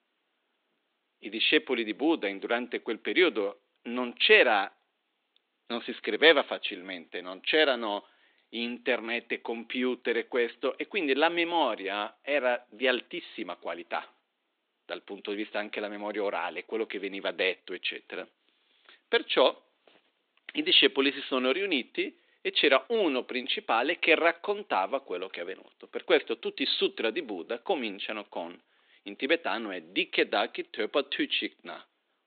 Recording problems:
high frequencies cut off; severe; nothing above 4 kHz
thin; somewhat; fading below 300 Hz

